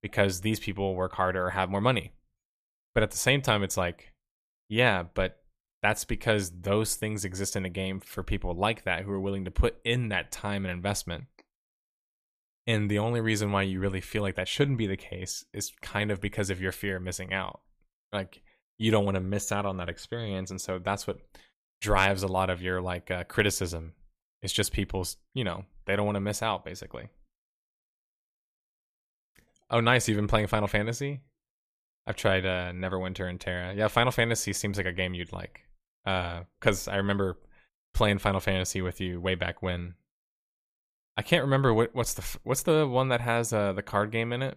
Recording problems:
none

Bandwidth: 15 kHz